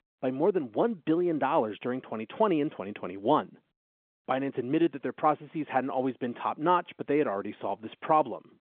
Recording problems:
phone-call audio

